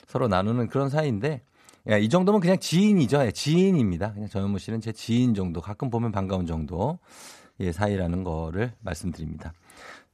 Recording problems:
none

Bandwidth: 14 kHz